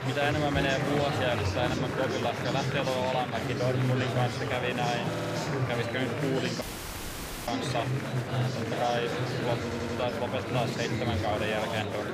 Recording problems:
murmuring crowd; very loud; throughout; 1 dB above the speech
audio stuttering; at 5 s and at 9.5 s
audio cutting out; at 6.5 s for 1 s

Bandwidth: 15 kHz